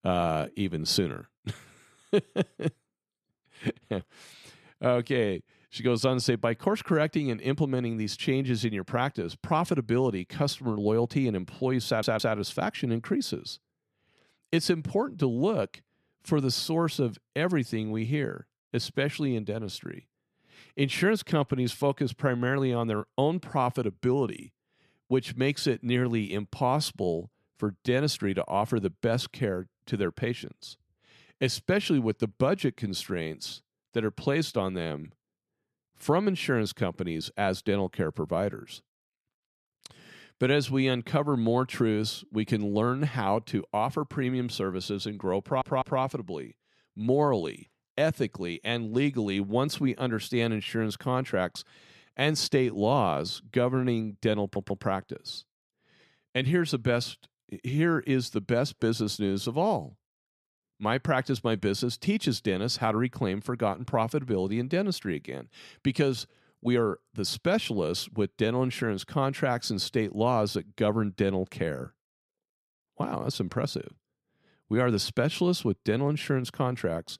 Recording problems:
audio stuttering; at 12 s, at 45 s and at 54 s

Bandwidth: 13.5 kHz